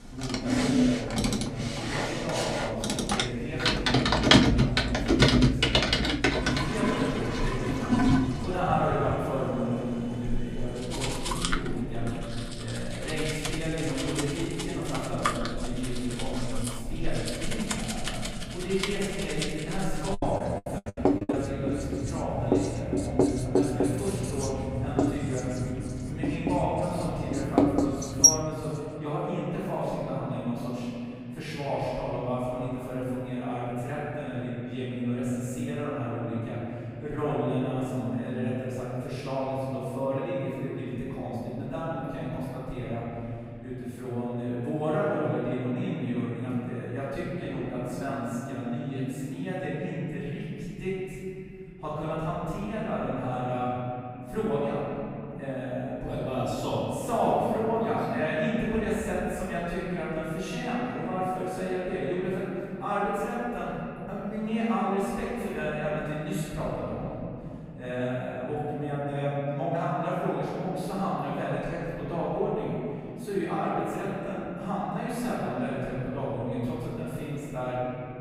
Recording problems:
room echo; strong; dies away in 3 s
off-mic speech; far
household noises; very loud; until 28 s; 4 dB above the speech
choppy; very; from 20 to 21 s; 24% of the speech affected

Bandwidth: 15.5 kHz